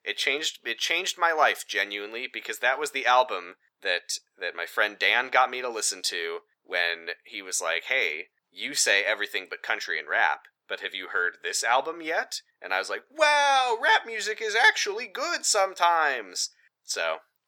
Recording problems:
thin; very; fading below 850 Hz

